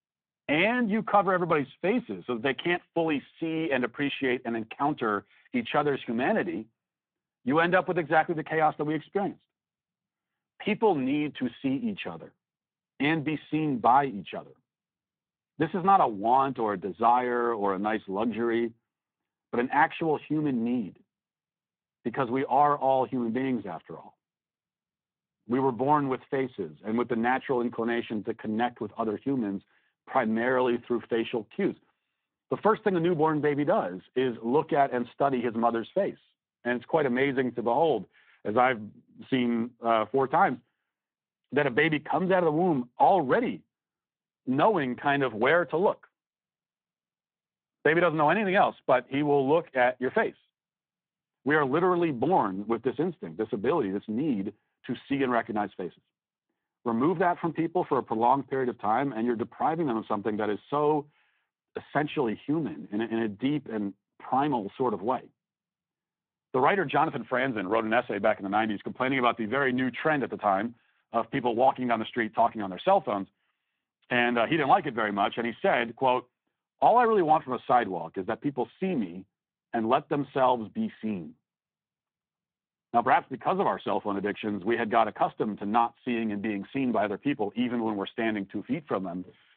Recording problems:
phone-call audio

